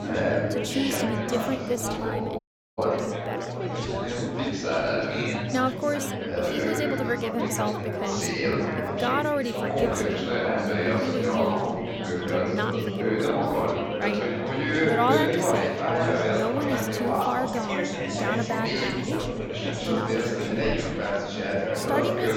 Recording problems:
chatter from many people; very loud; throughout; 4 dB above the speech
audio cutting out; at 2.5 s

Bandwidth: 17 kHz